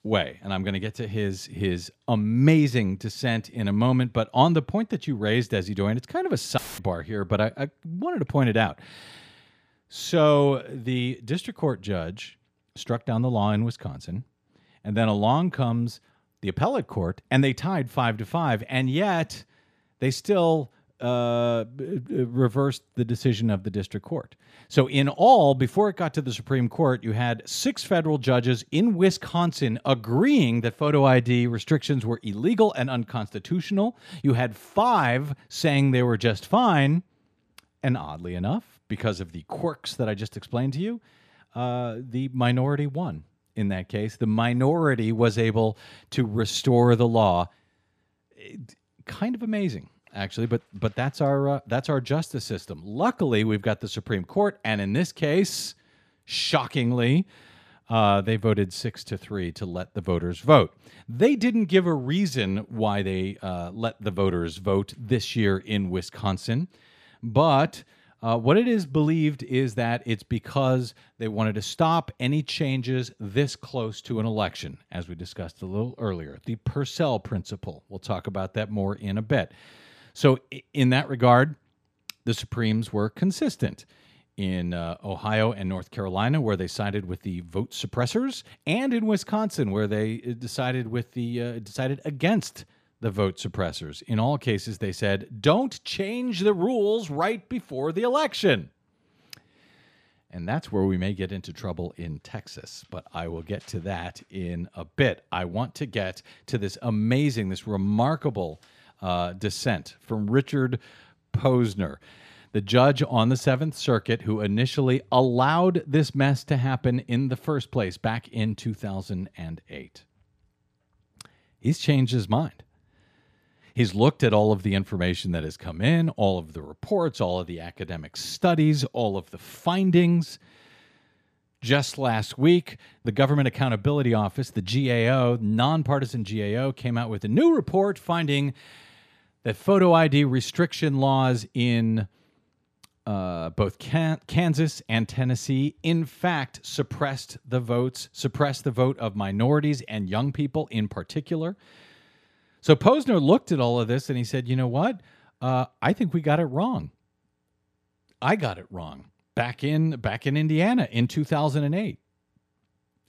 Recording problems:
audio cutting out; filled with static; at 6.5 s

